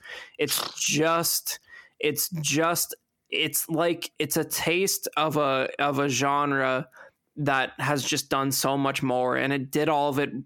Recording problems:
squashed, flat; heavily

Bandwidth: 17 kHz